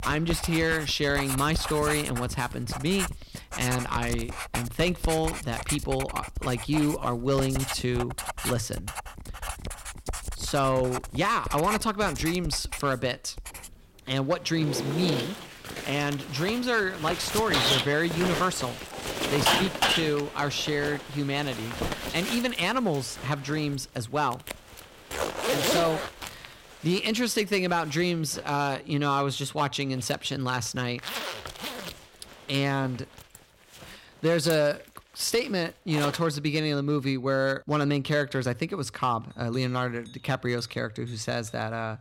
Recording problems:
distortion; heavy; 3% of the sound clipped
household noises; loud; throughout; 4 dB below the speech

